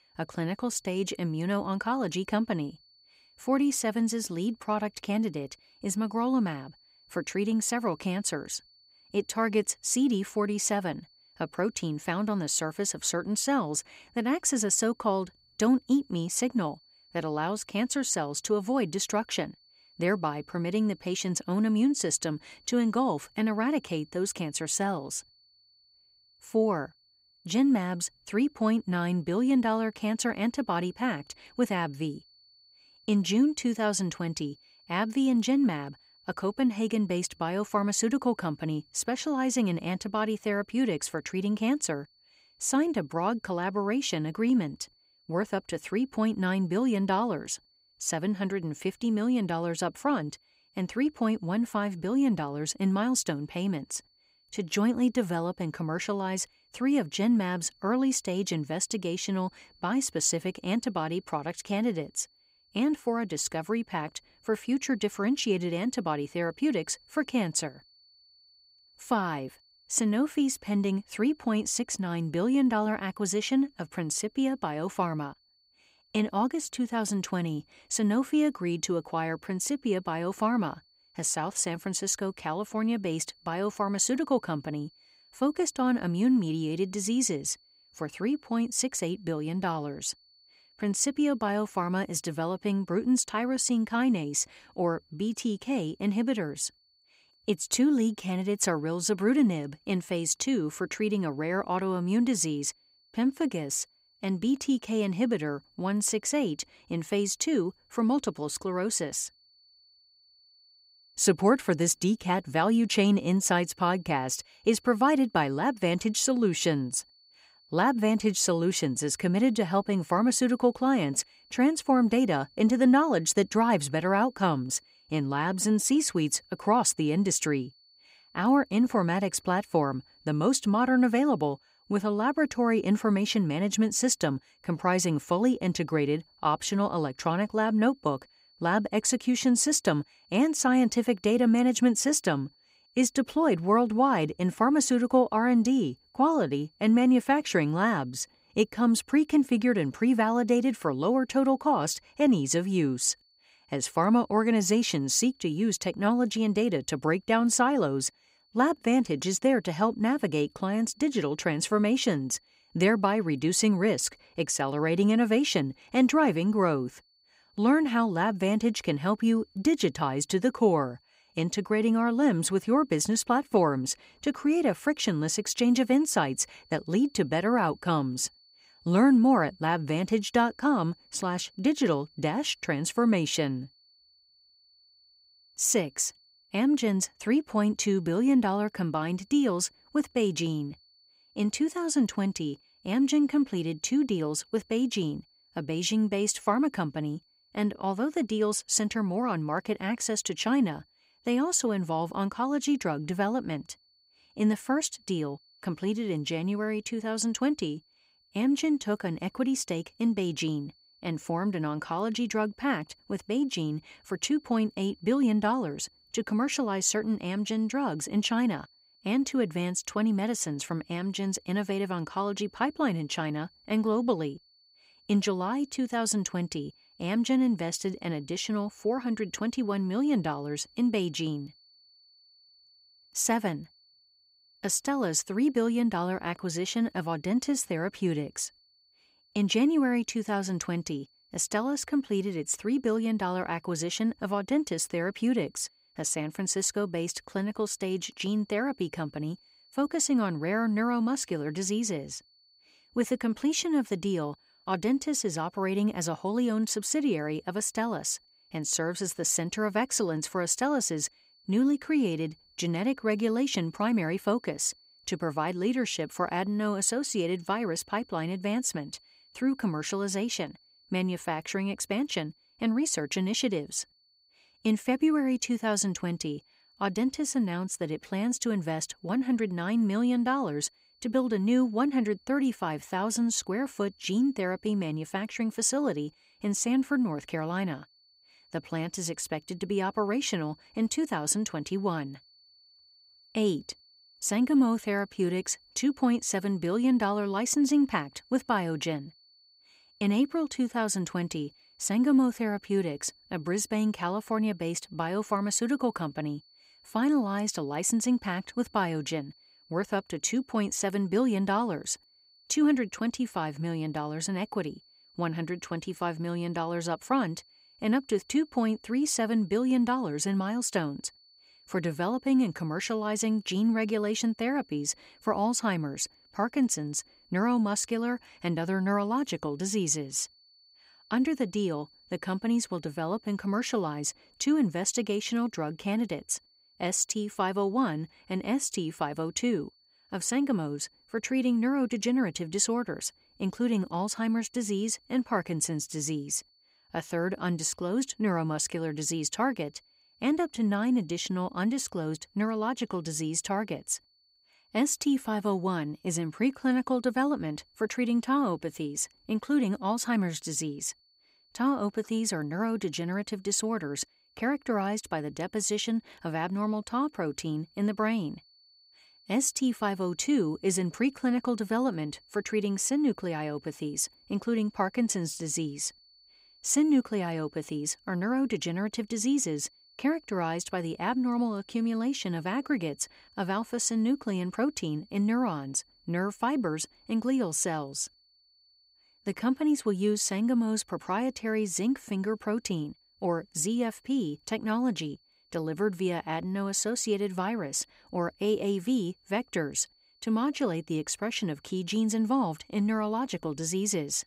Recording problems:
high-pitched whine; faint; throughout; 4.5 kHz, 30 dB below the speech

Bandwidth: 15.5 kHz